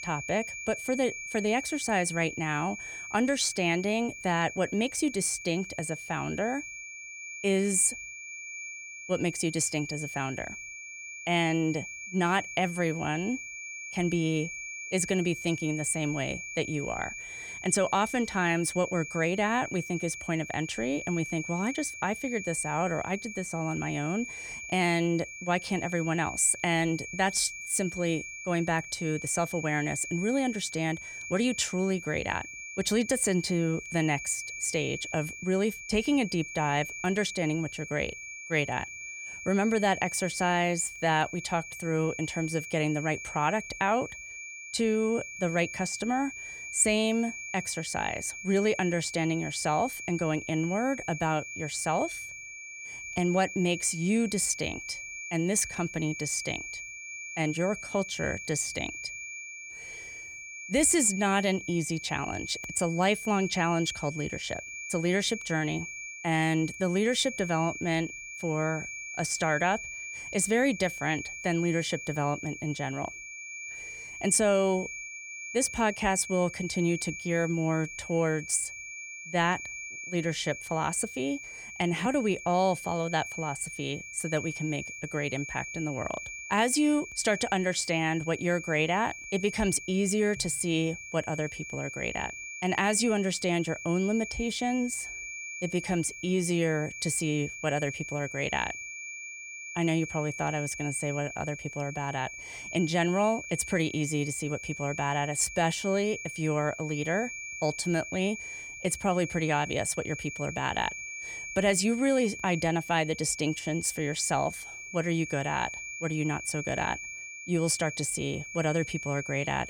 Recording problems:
high-pitched whine; loud; throughout; 2.5 kHz, 9 dB below the speech

